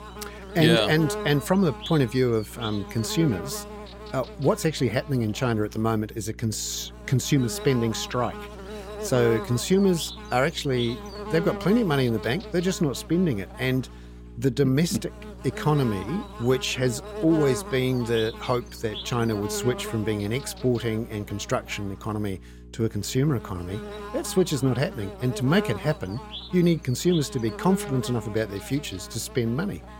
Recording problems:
electrical hum; loud; throughout; 60 Hz, 10 dB below the speech

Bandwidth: 16.5 kHz